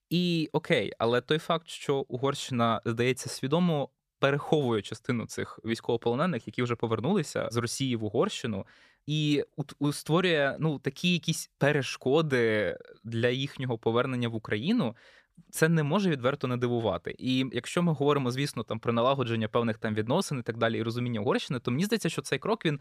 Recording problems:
none

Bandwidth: 14.5 kHz